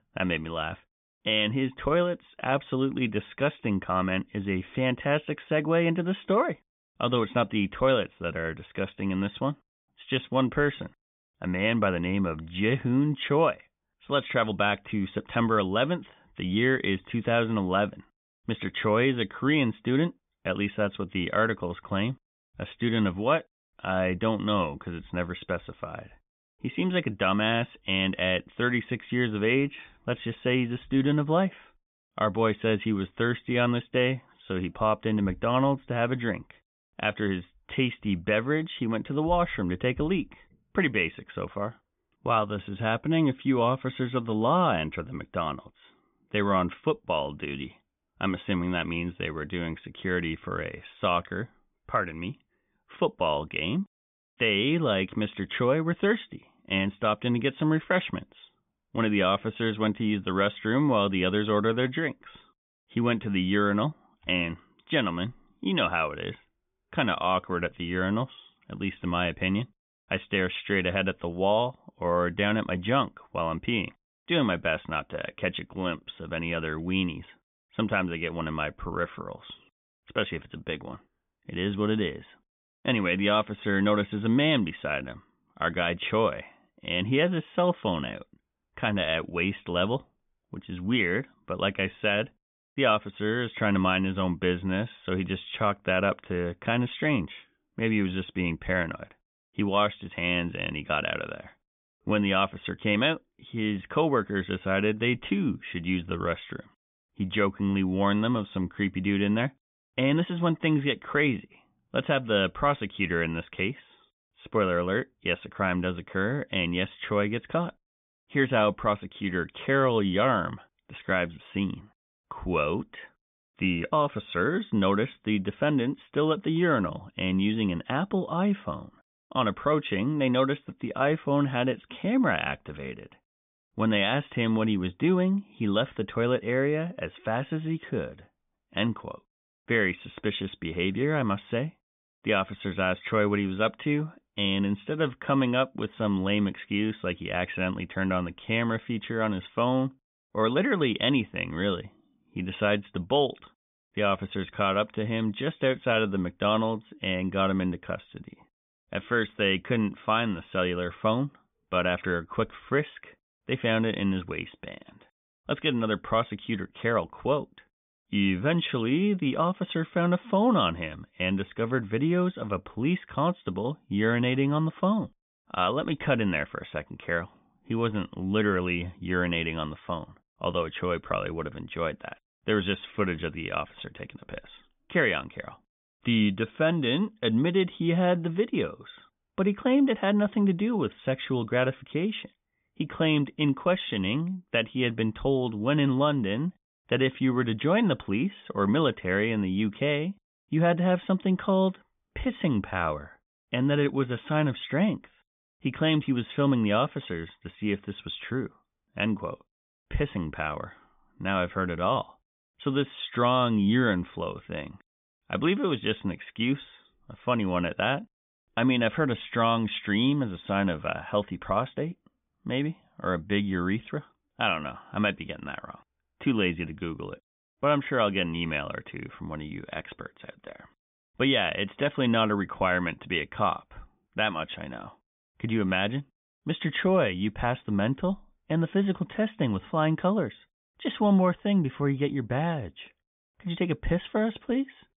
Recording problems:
high frequencies cut off; severe; nothing above 3.5 kHz

